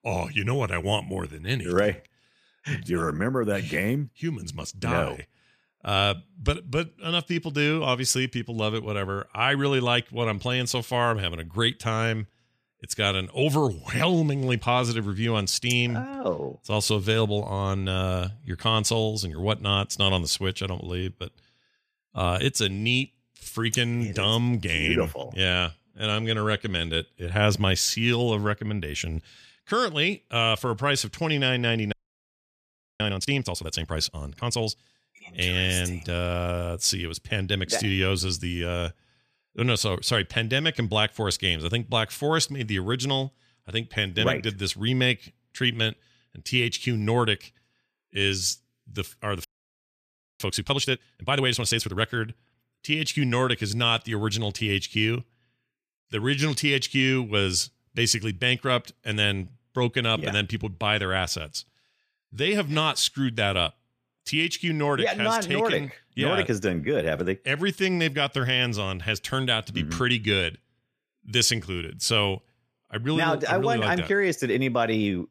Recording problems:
audio freezing; at 32 s for 1 s and at 49 s for 1 s

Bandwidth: 14.5 kHz